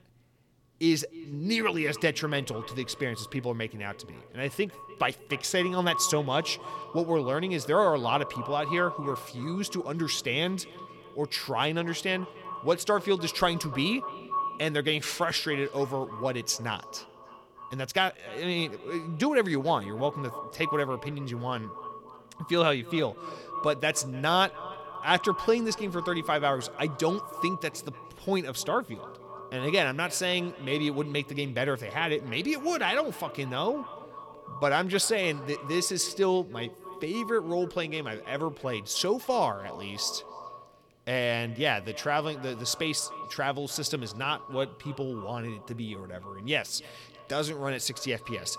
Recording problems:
echo of what is said; noticeable; throughout; 300 ms later, 15 dB below the speech

